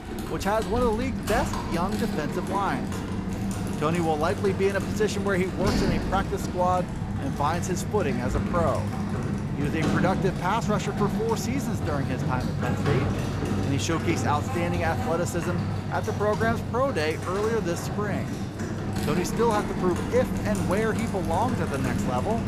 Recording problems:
household noises; loud; throughout; 1 dB below the speech

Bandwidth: 14.5 kHz